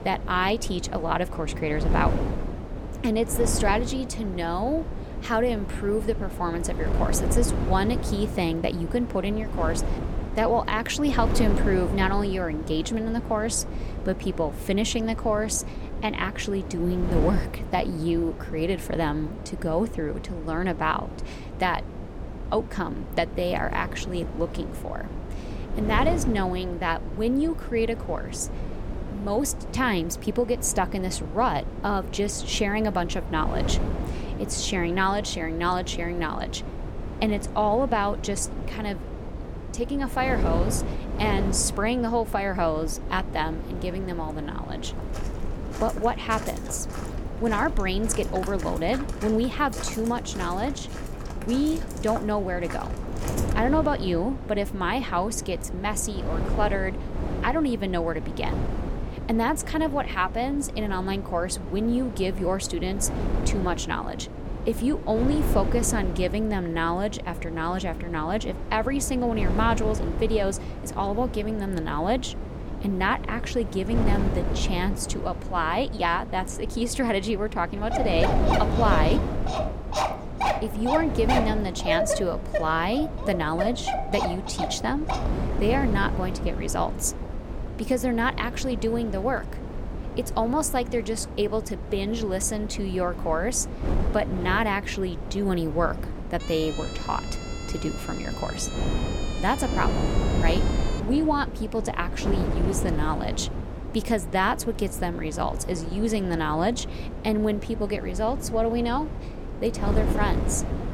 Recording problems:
wind noise on the microphone; occasional gusts; 10 dB below the speech
footsteps; noticeable; from 45 to 54 s; peak 9 dB below the speech
dog barking; loud; from 1:18 to 1:25; peak 2 dB above the speech
siren; faint; from 1:36 to 1:41; peak 10 dB below the speech

